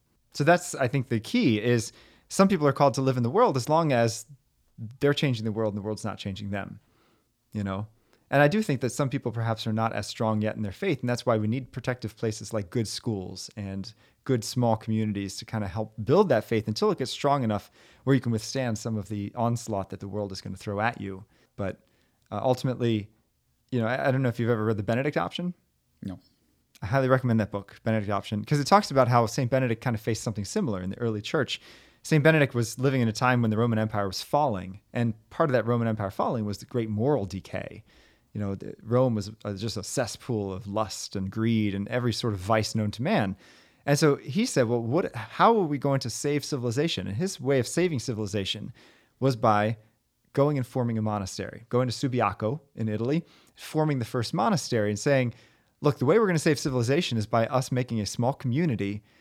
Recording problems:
none

